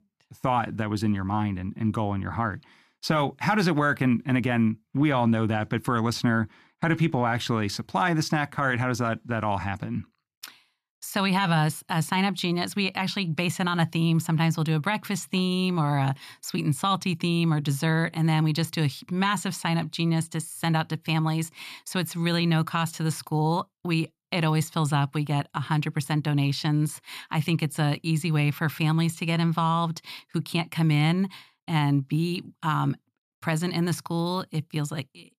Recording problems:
none

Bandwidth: 14.5 kHz